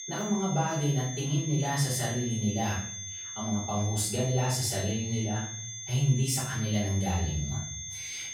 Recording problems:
off-mic speech; far
room echo; noticeable; dies away in 0.5 s
high-pitched whine; loud; throughout; 6.5 kHz, 7 dB below the speech

